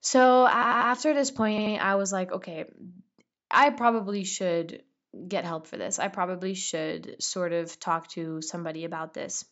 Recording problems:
high frequencies cut off; noticeable; nothing above 8 kHz
audio stuttering; at 0.5 s and at 1.5 s

